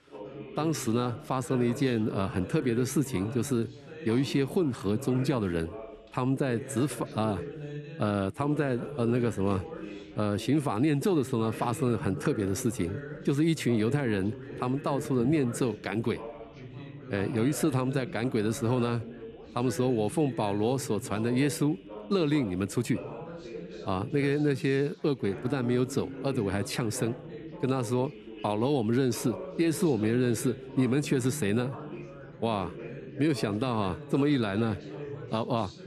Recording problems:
background chatter; noticeable; throughout; 3 voices, 10 dB below the speech

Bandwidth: 13.5 kHz